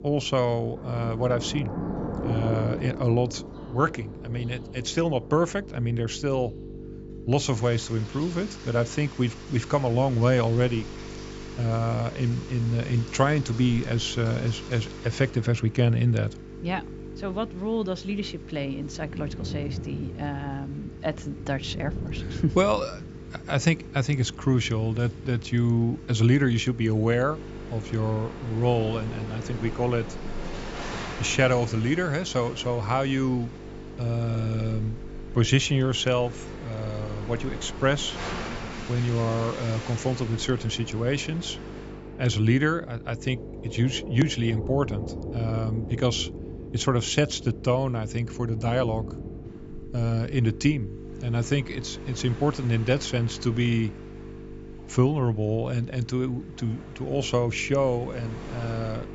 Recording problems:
high frequencies cut off; noticeable; nothing above 8 kHz
electrical hum; noticeable; throughout; 50 Hz, 15 dB below the speech
rain or running water; noticeable; throughout; 15 dB below the speech

